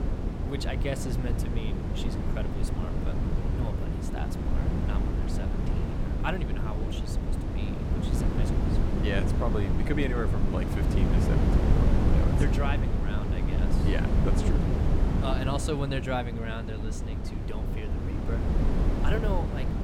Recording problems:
wind noise on the microphone; heavy; as loud as the speech

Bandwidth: 17 kHz